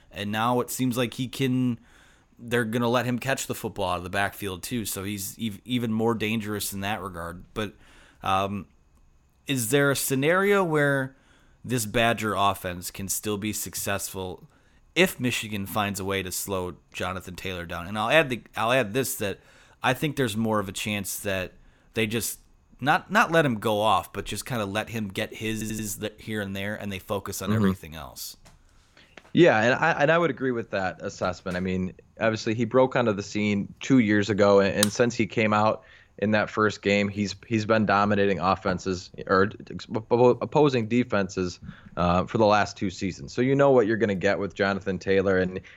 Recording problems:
audio stuttering; at 26 s

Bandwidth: 17.5 kHz